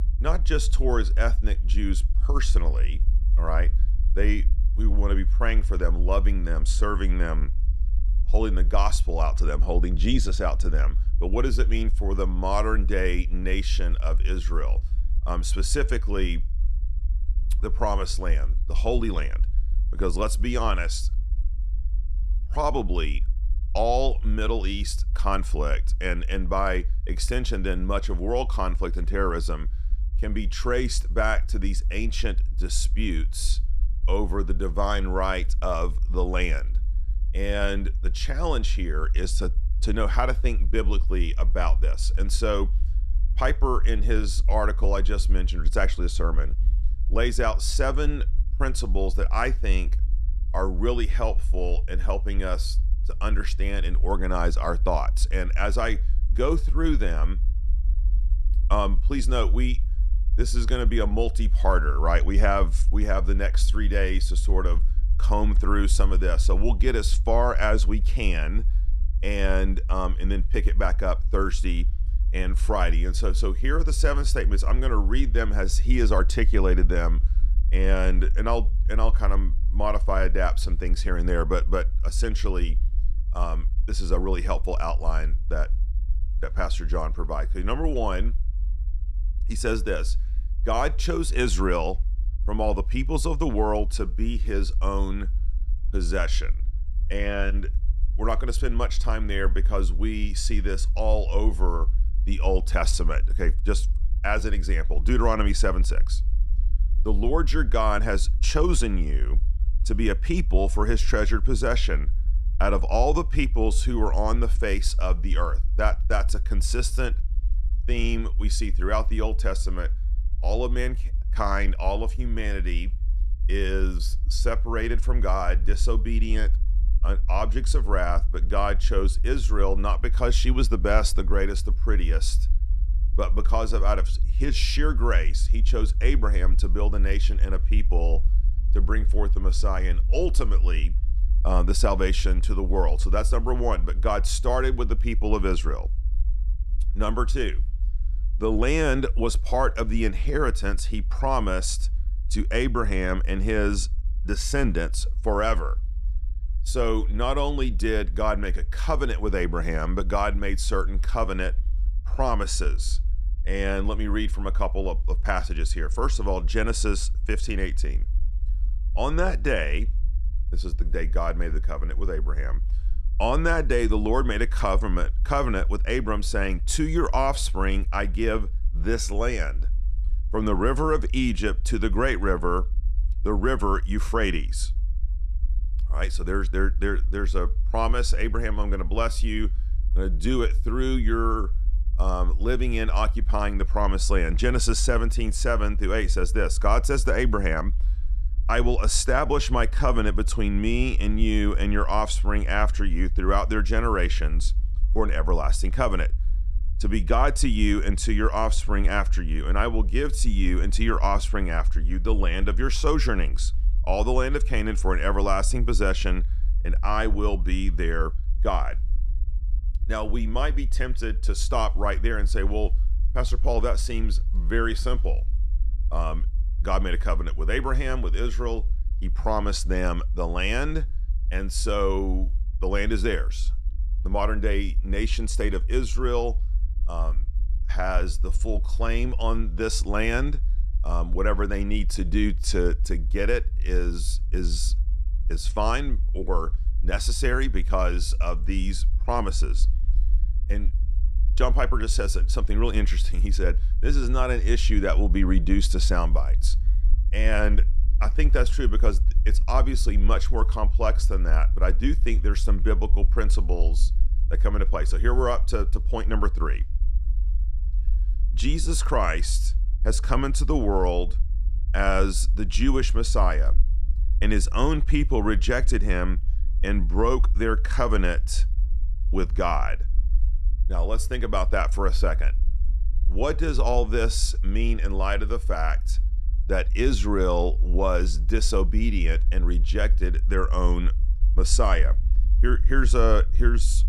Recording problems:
low rumble; faint; throughout; 20 dB below the speech

